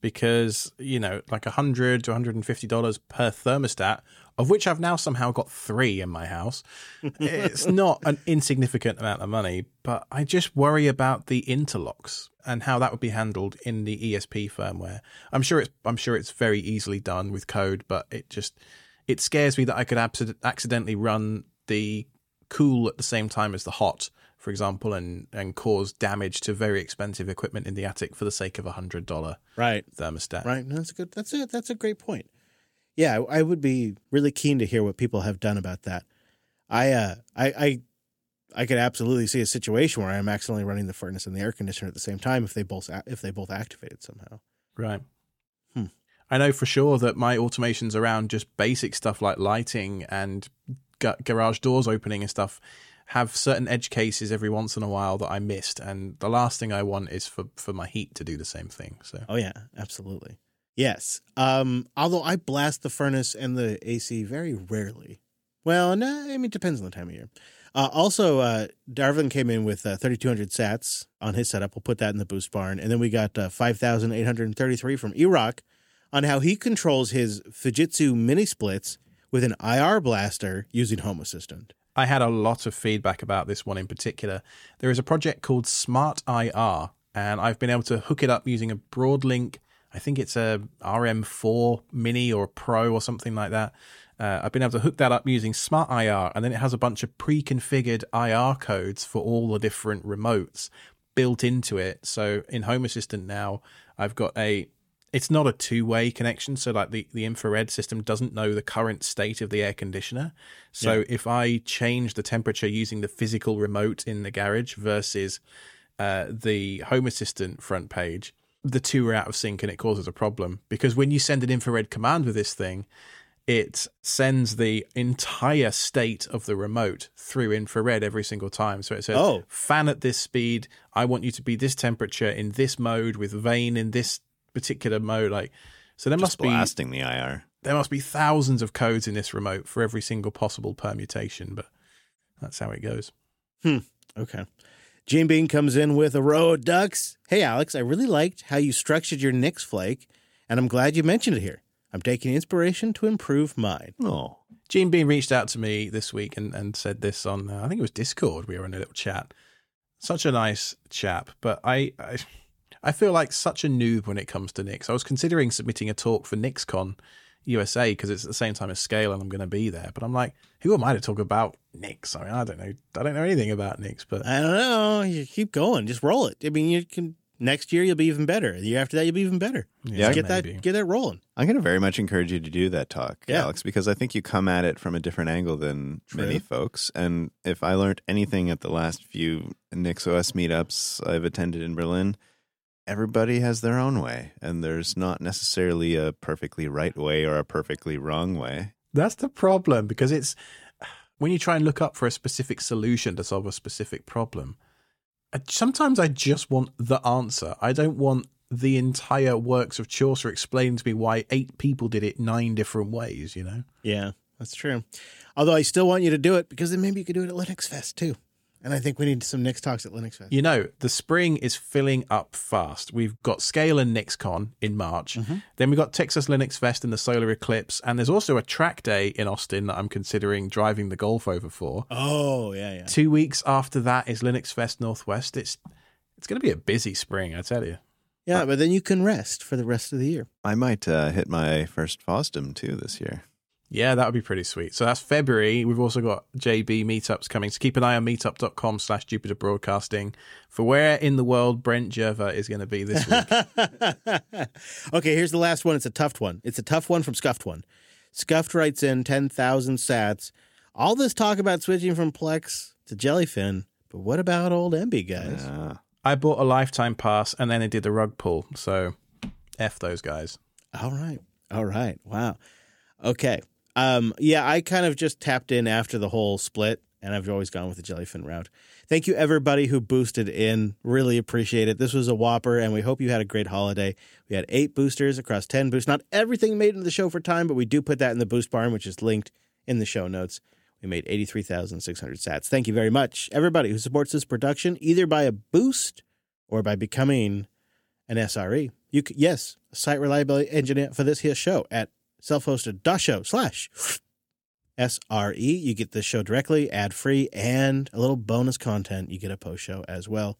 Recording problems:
none

